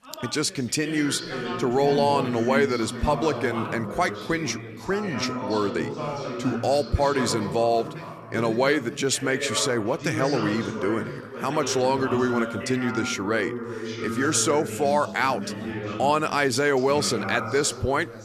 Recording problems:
background chatter; loud; throughout; 3 voices, 7 dB below the speech

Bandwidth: 14 kHz